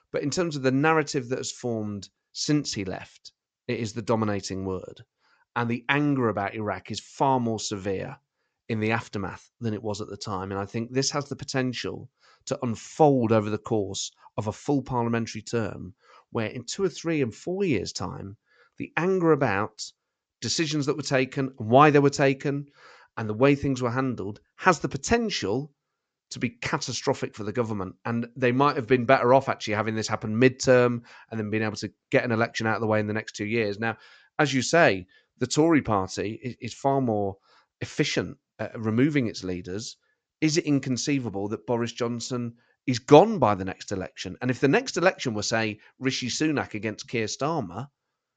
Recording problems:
high frequencies cut off; noticeable; nothing above 8 kHz

